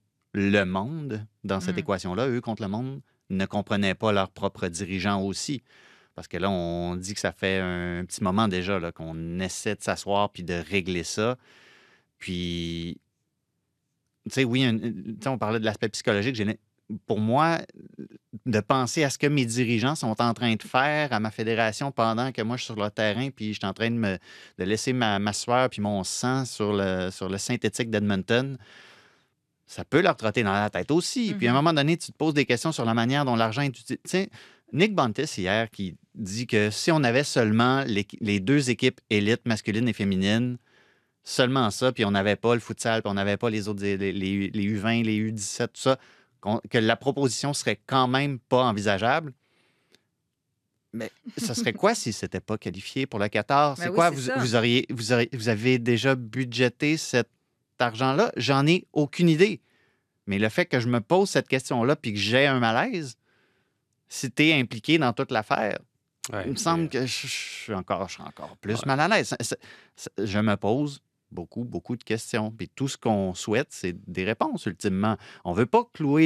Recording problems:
abrupt cut into speech; at the end

